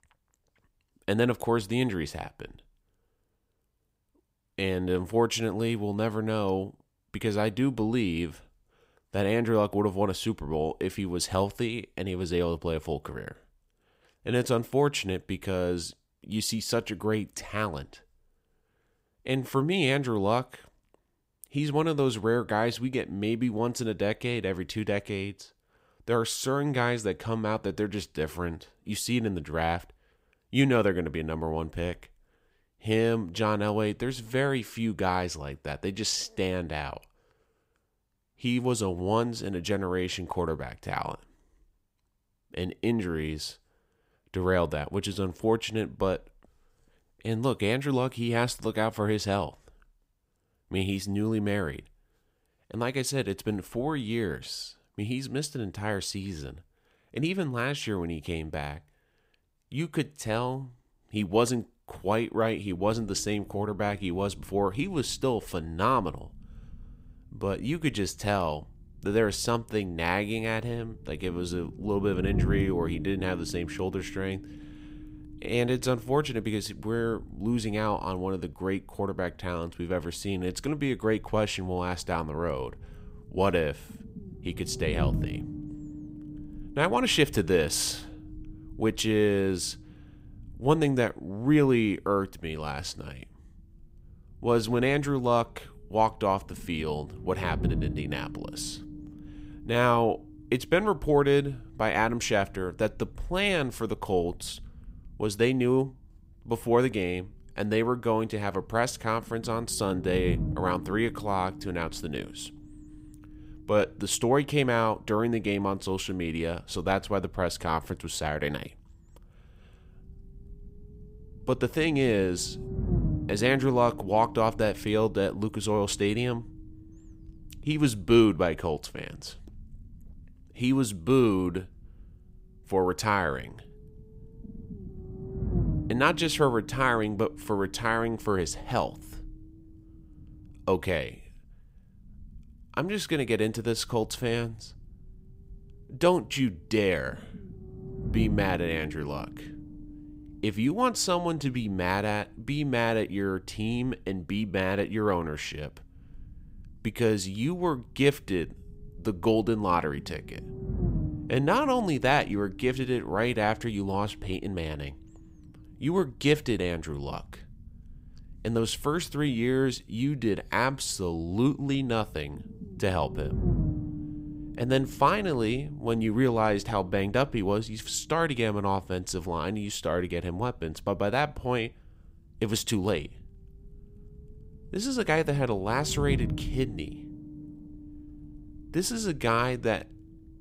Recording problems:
low rumble; noticeable; from 1:03 on; 20 dB below the speech

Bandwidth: 15.5 kHz